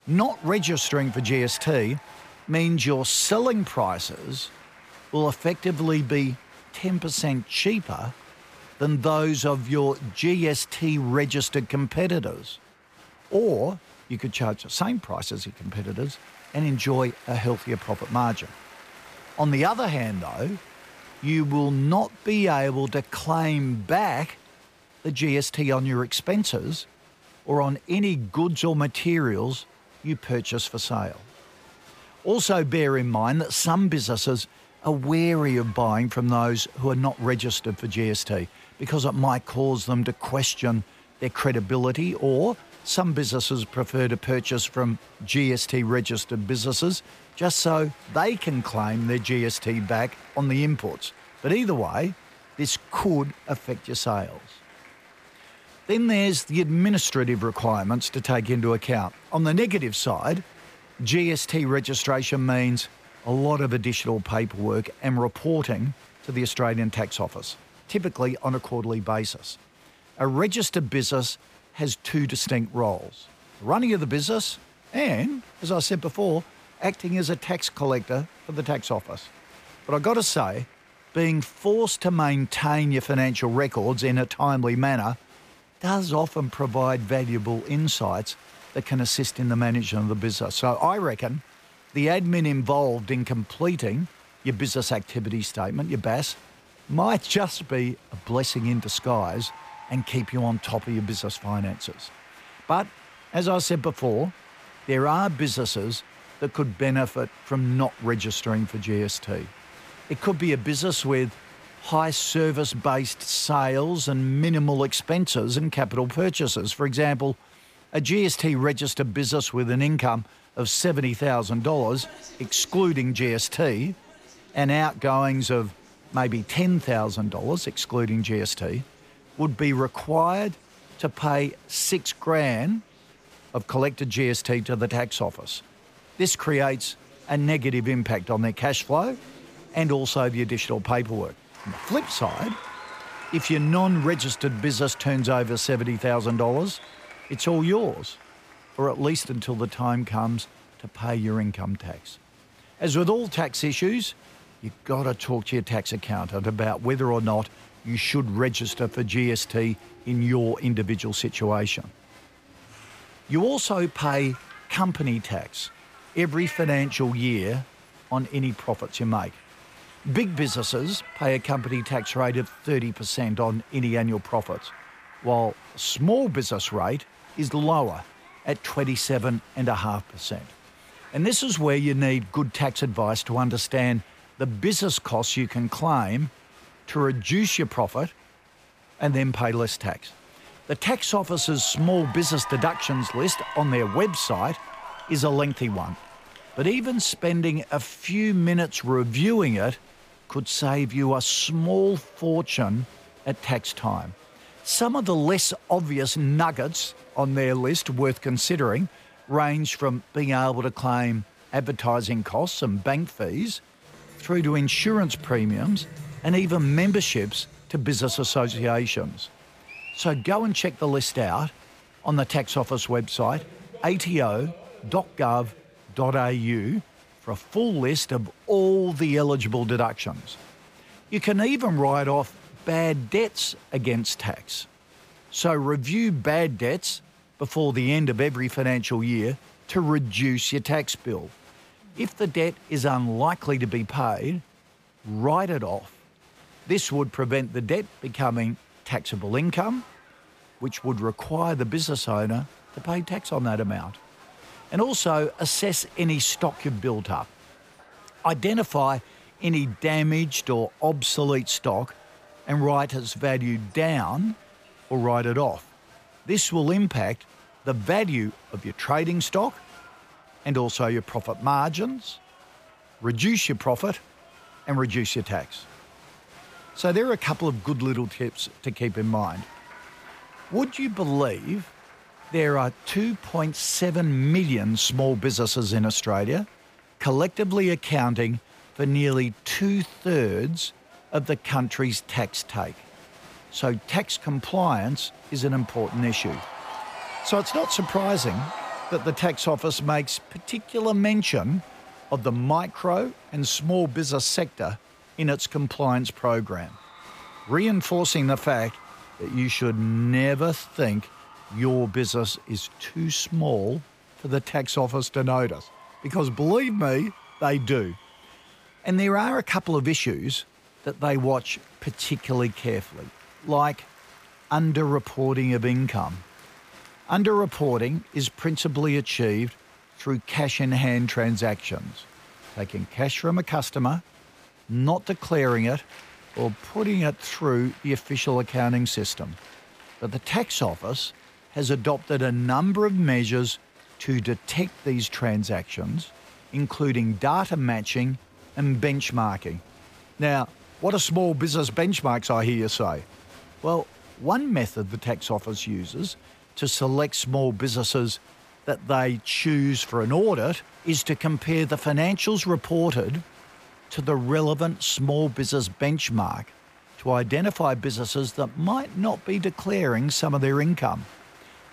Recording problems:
crowd noise; faint; throughout; 20 dB below the speech

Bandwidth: 15 kHz